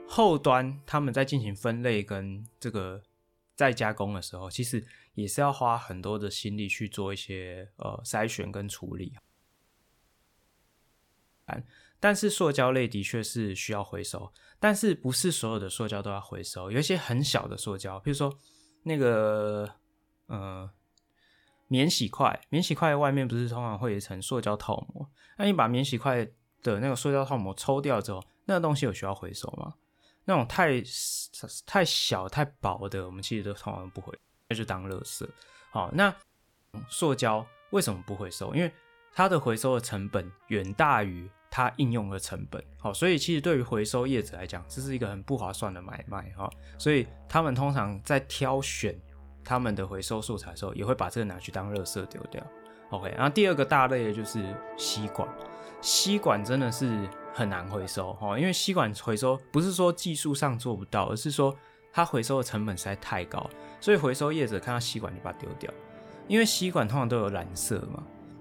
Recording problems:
background music; noticeable; throughout; 20 dB below the speech
audio cutting out; at 9 s for 2.5 s, at 34 s and at 36 s for 0.5 s

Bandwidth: 18 kHz